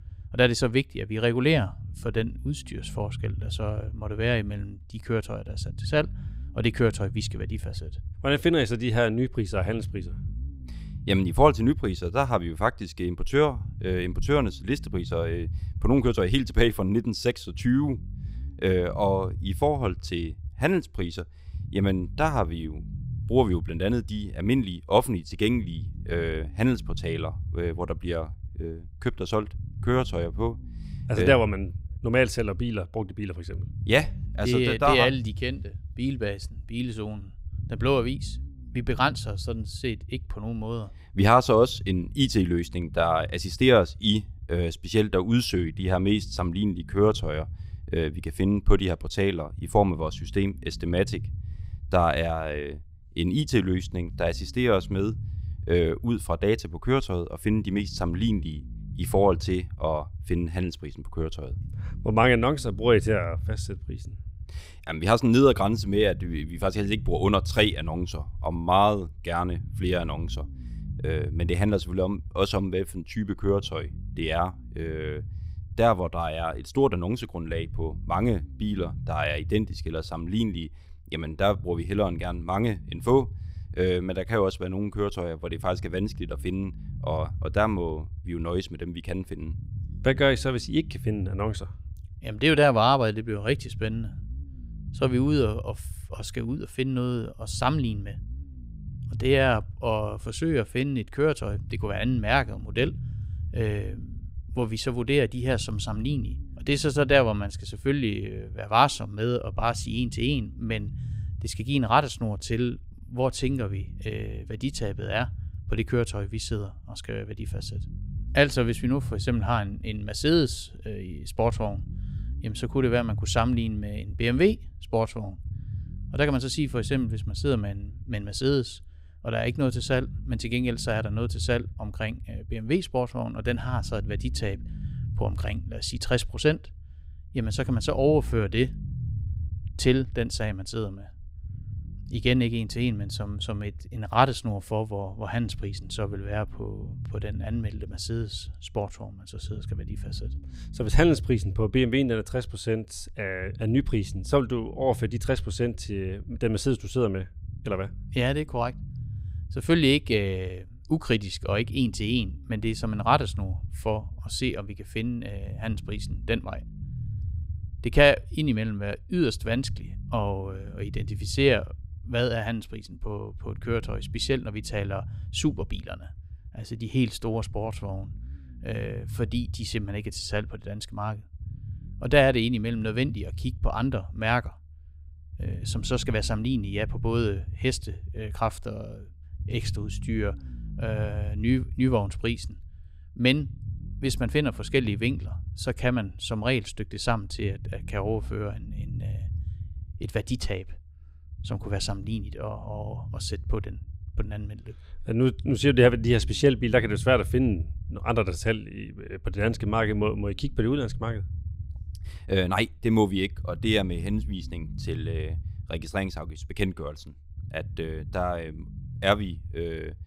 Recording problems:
low rumble; faint; throughout; 25 dB below the speech

